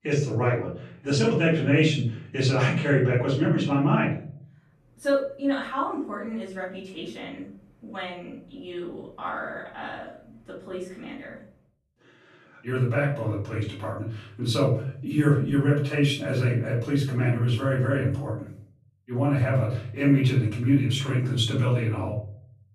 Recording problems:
off-mic speech; far
room echo; noticeable; dies away in 0.5 s

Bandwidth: 14 kHz